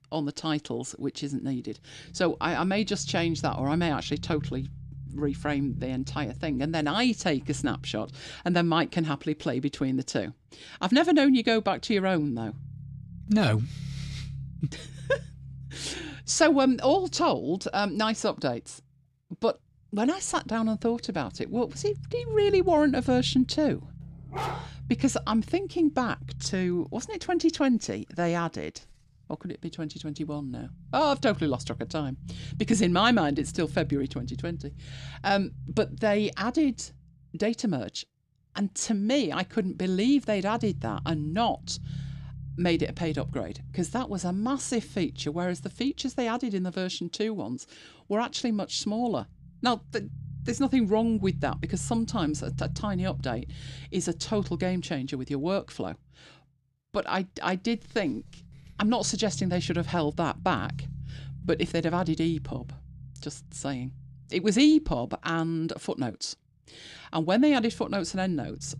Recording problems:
low rumble; faint; throughout; 25 dB below the speech
dog barking; noticeable; at 24 s; peak 6 dB below the speech

